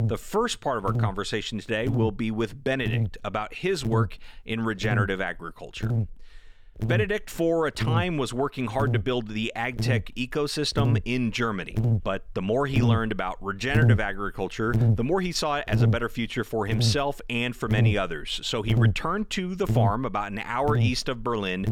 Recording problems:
electrical hum; loud; throughout; 50 Hz, 9 dB below the speech

